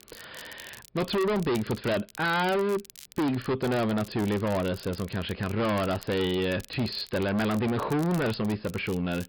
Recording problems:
distortion; heavy; 24% of the sound clipped
high frequencies cut off; noticeable; nothing above 5.5 kHz
crackle, like an old record; faint; 20 dB below the speech

